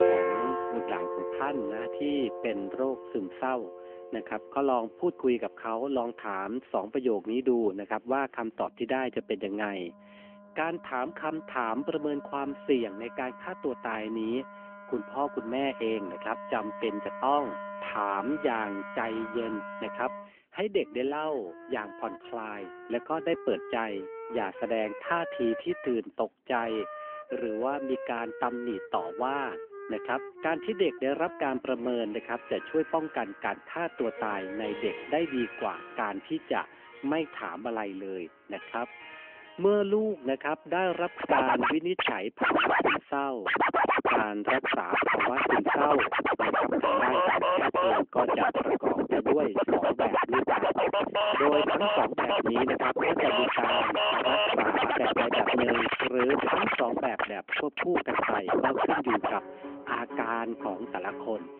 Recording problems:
phone-call audio; nothing above 3 kHz
background music; very loud; throughout; 3 dB above the speech

